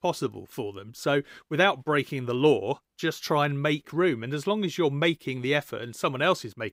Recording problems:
none

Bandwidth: 15.5 kHz